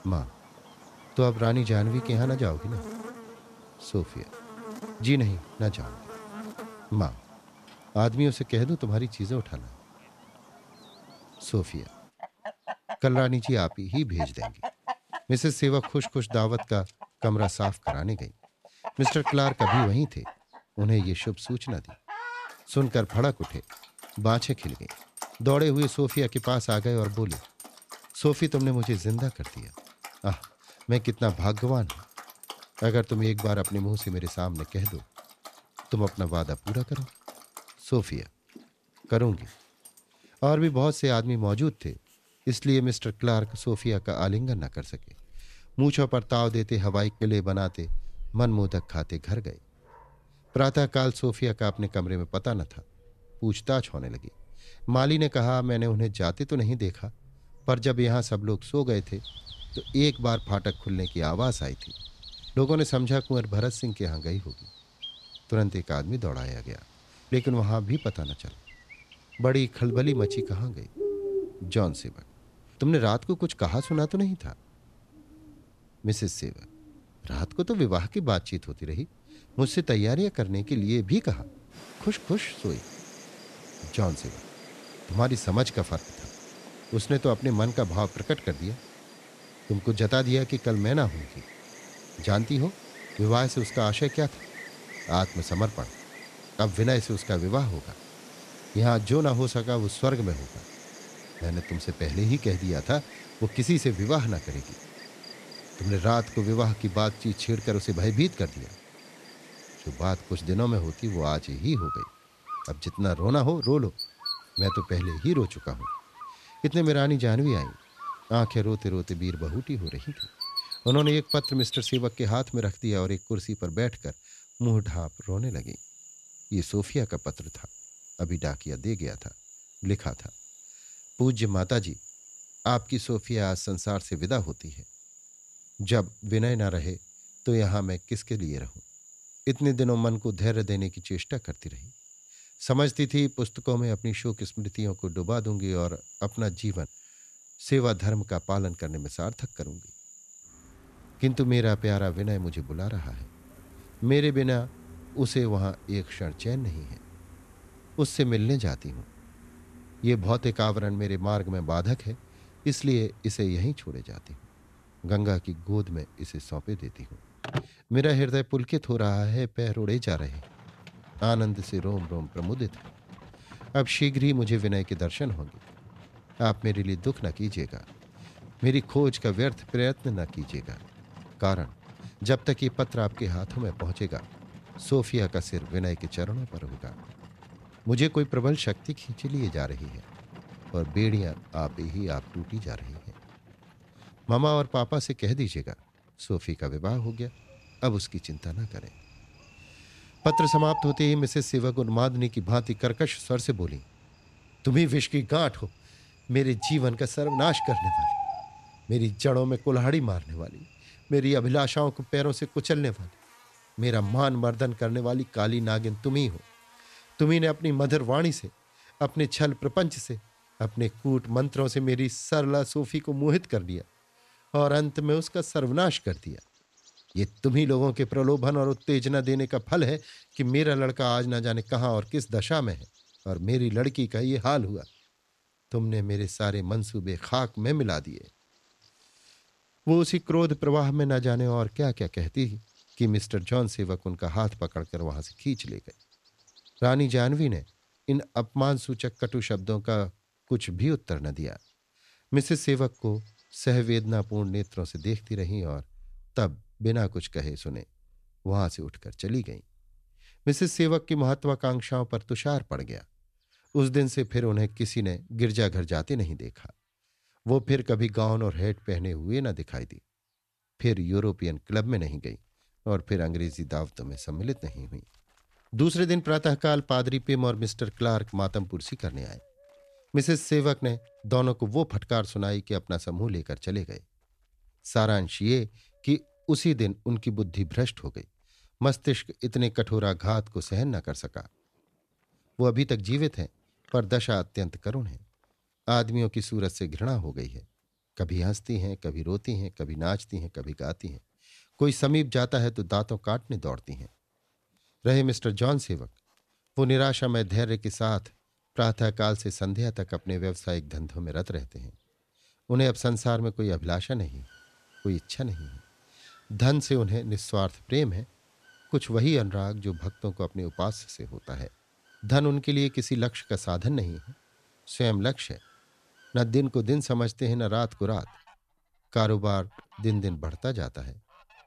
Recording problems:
animal sounds; noticeable; throughout; 15 dB below the speech

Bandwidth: 14 kHz